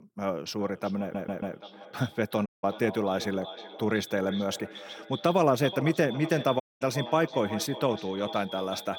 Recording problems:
echo of what is said; noticeable; throughout; 370 ms later, 15 dB below the speech
audio stuttering; at 1 s
audio cutting out; at 2.5 s and at 6.5 s

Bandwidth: 17.5 kHz